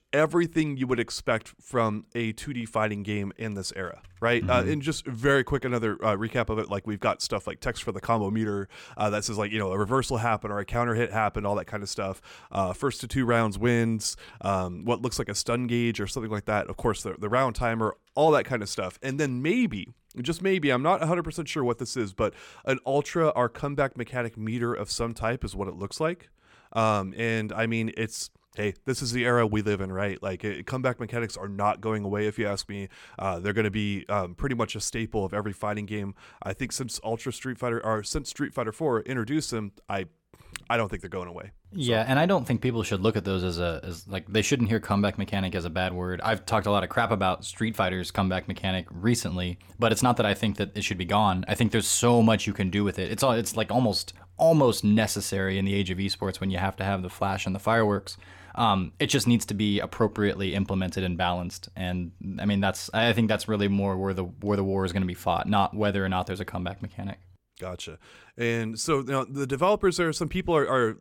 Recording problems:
none

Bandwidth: 17 kHz